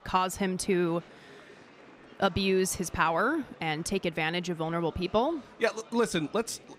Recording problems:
murmuring crowd; faint; throughout; 20 dB below the speech

